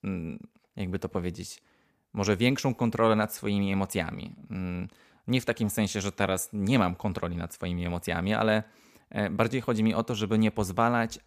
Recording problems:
none

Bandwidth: 15 kHz